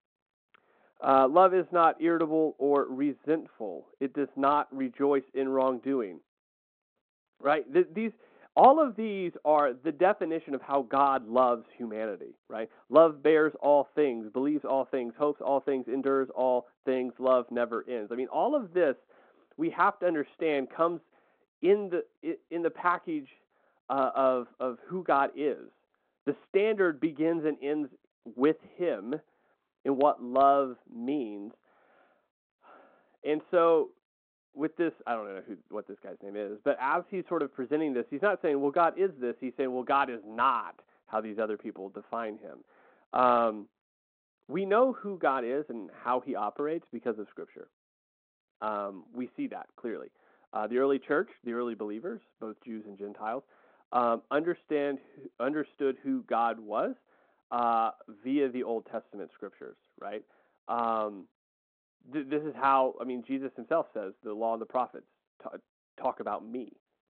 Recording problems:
phone-call audio; nothing above 4 kHz
muffled; very slightly; fading above 2 kHz

